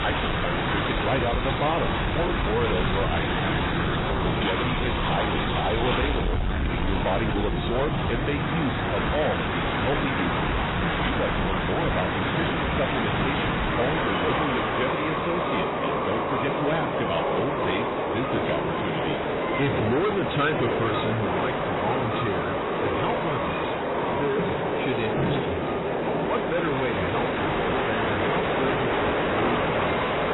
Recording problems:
distortion; heavy; 8 dB below the speech
garbled, watery; badly; nothing above 4 kHz
train or aircraft noise; very loud; throughout; 2 dB above the speech

